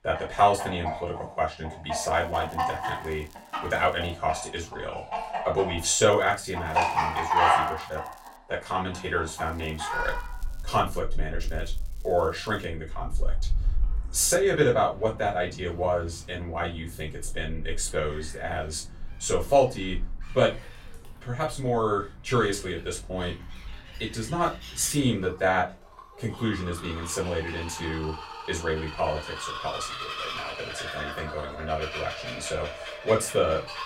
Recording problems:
off-mic speech; far
room echo; very slight; dies away in 0.2 s
animal sounds; loud; throughout; 5 dB below the speech
crackling; faint; 4 times, first at 2 s; 25 dB below the speech

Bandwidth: 16 kHz